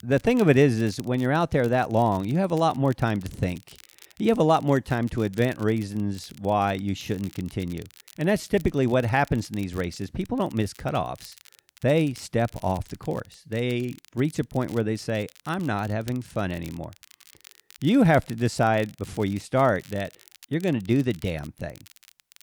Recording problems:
crackle, like an old record; faint; 25 dB below the speech

